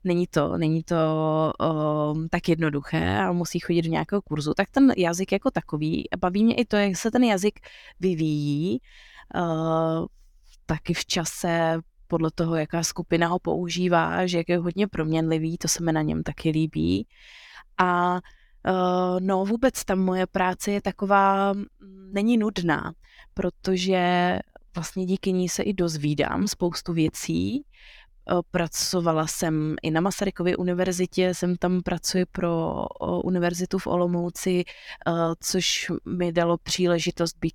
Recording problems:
none

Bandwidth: 18 kHz